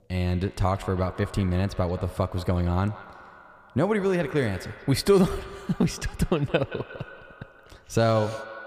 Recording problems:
echo of what is said; noticeable; throughout; 170 ms later, 15 dB below the speech

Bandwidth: 15 kHz